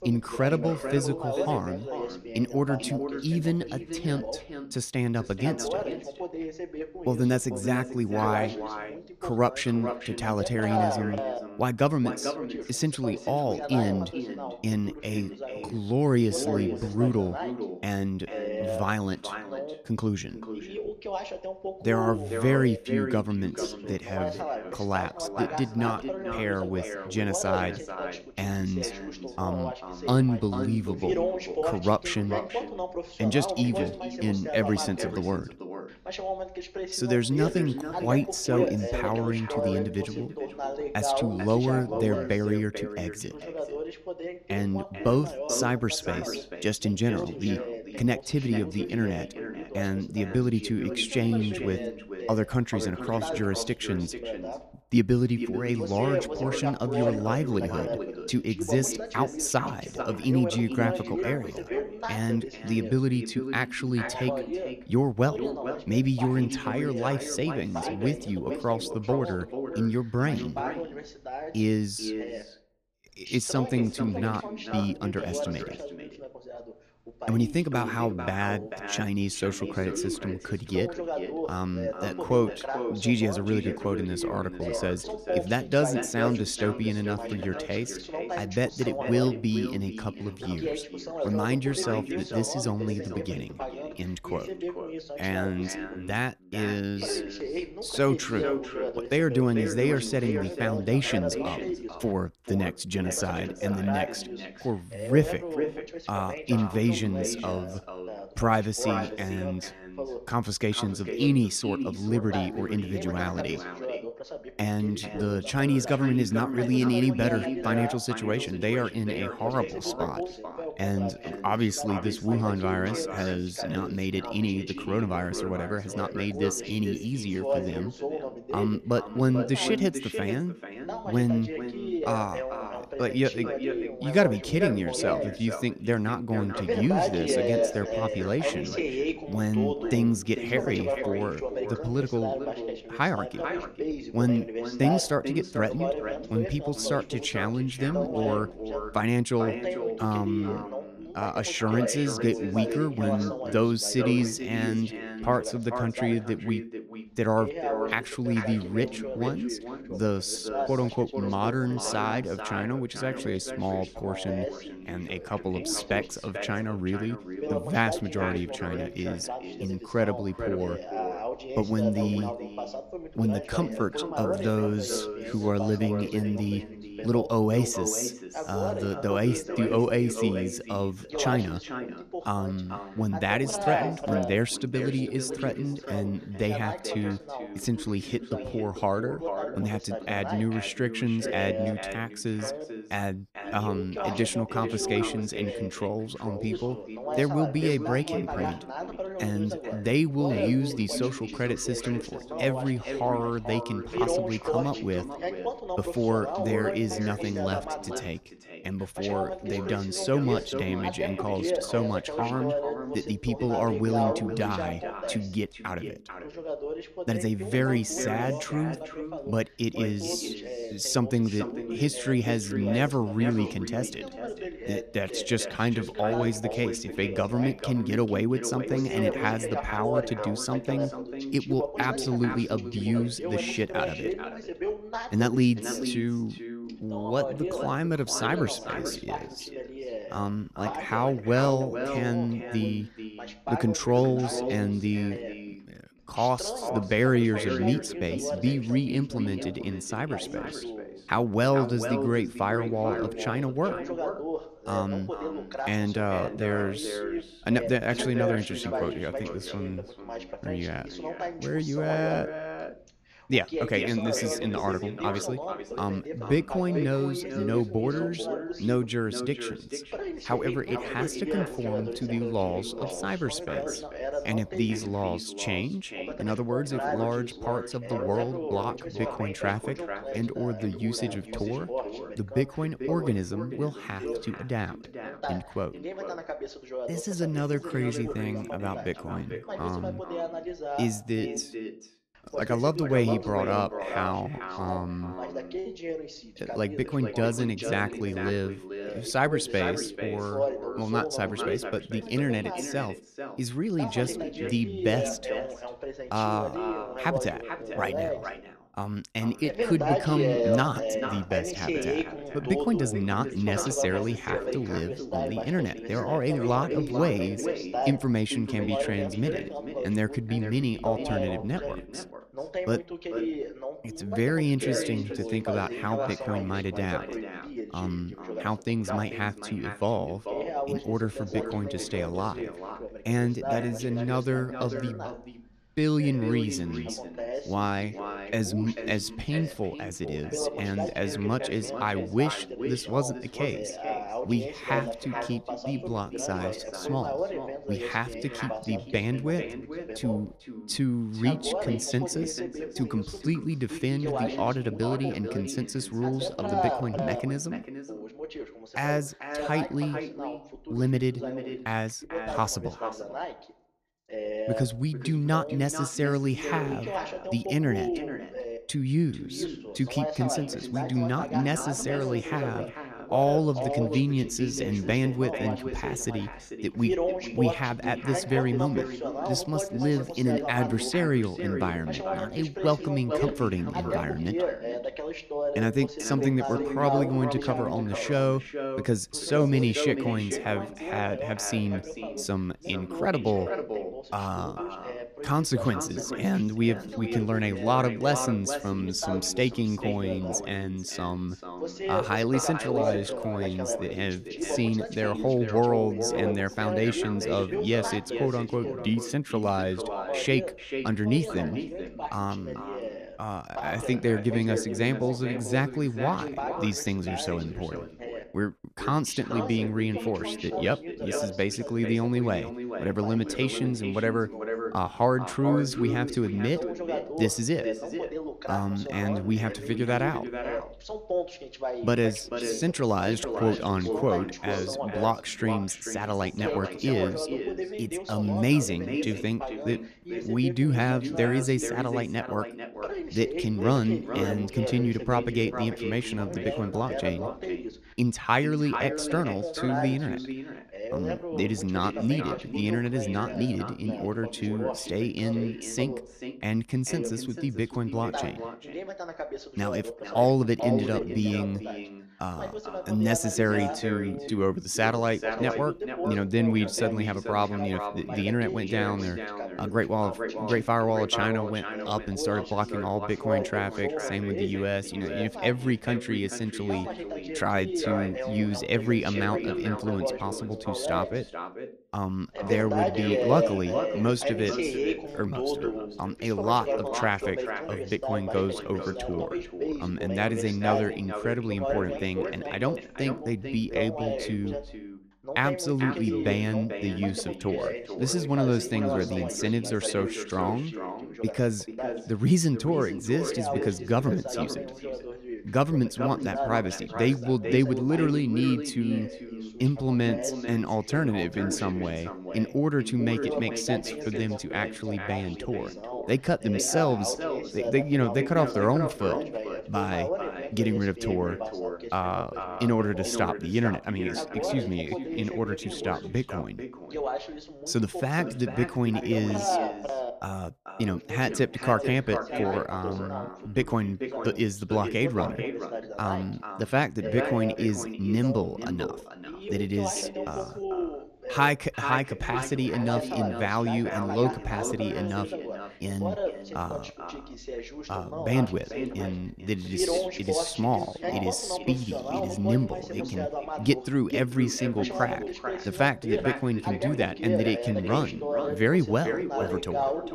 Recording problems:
echo of what is said; strong; throughout; 440 ms later, 9 dB below the speech
voice in the background; loud; throughout; 7 dB below the speech

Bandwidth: 14 kHz